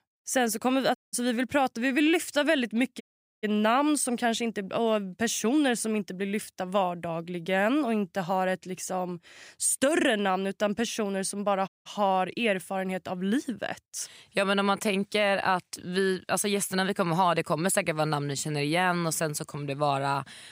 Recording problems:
audio cutting out; at 1 s, at 3 s and at 12 s

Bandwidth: 15.5 kHz